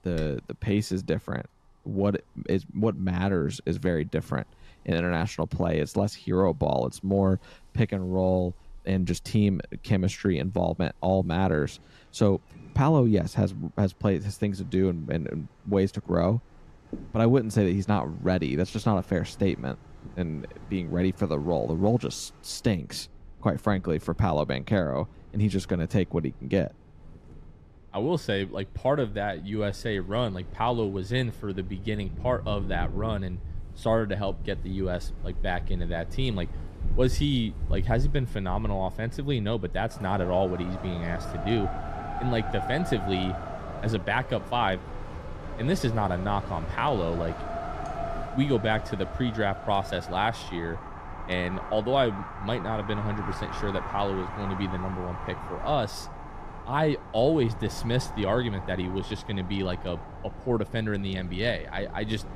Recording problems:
wind in the background; noticeable; throughout; 10 dB below the speech

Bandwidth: 14.5 kHz